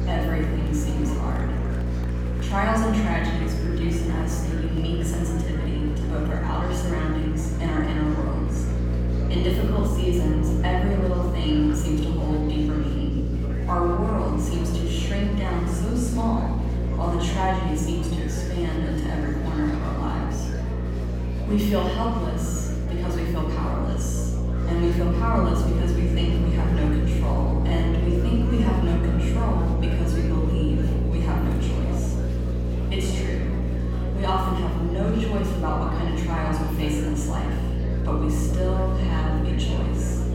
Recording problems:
off-mic speech; far
room echo; noticeable; dies away in 1.3 s
electrical hum; loud; throughout; 60 Hz, 7 dB below the speech
murmuring crowd; noticeable; throughout; 10 dB below the speech

